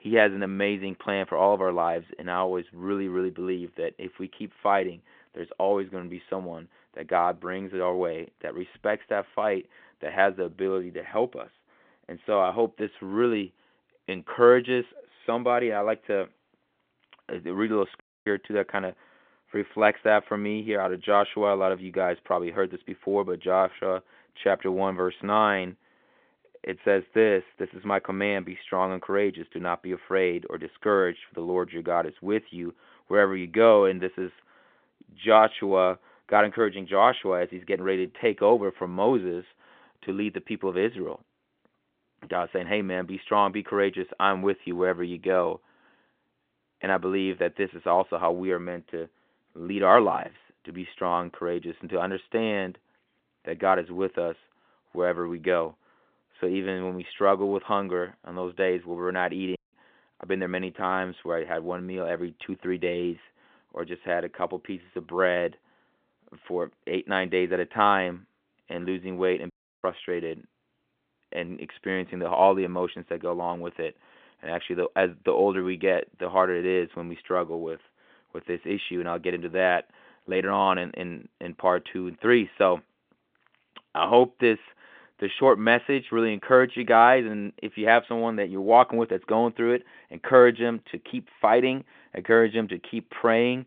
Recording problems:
phone-call audio
audio cutting out; at 18 s, at 1:00 and at 1:10

